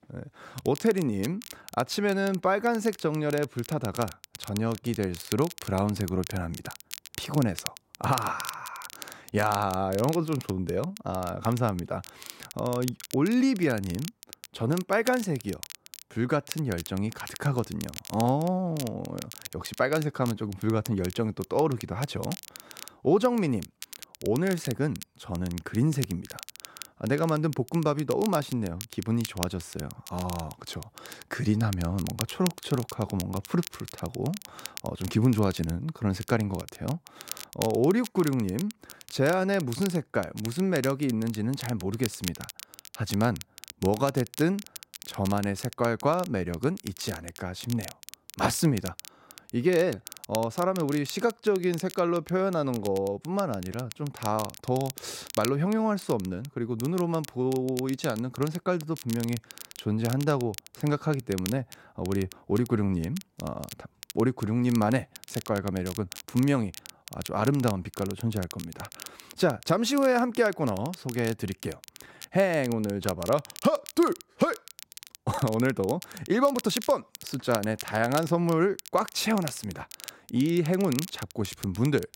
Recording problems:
crackle, like an old record; noticeable; 15 dB below the speech

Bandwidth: 16 kHz